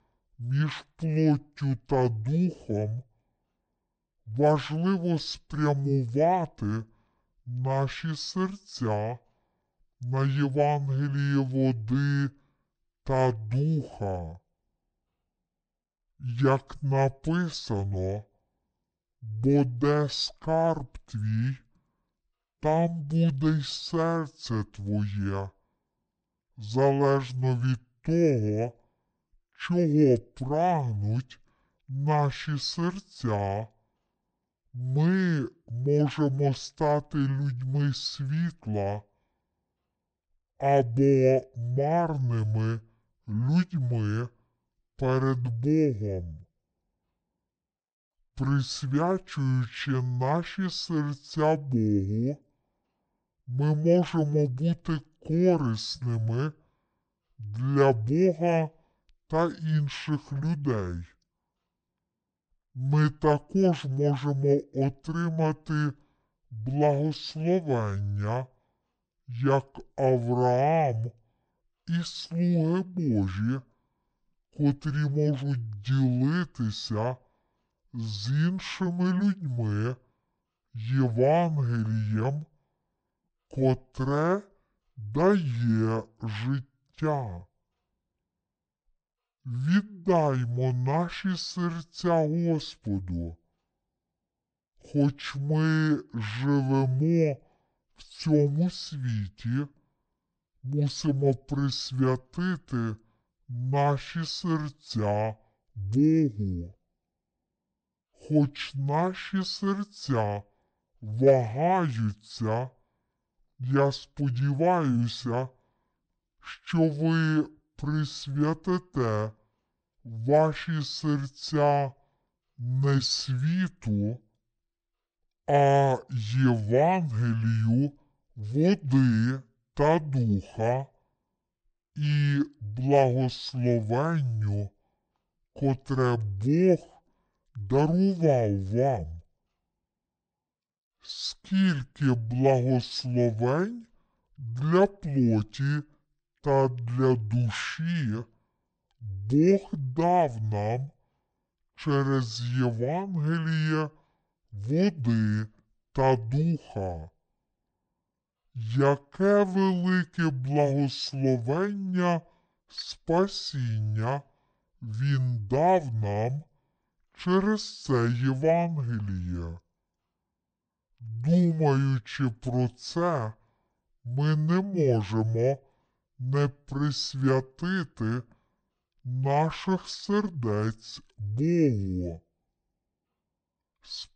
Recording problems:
wrong speed and pitch; too slow and too low; 0.6 times normal speed

